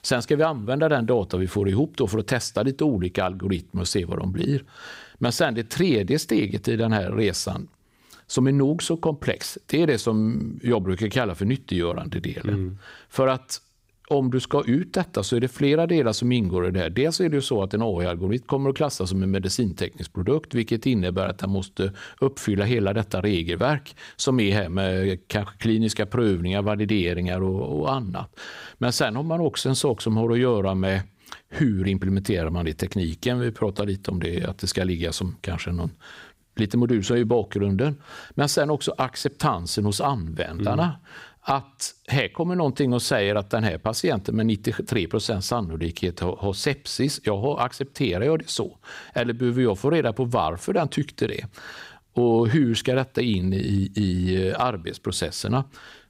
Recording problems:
none

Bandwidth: 15.5 kHz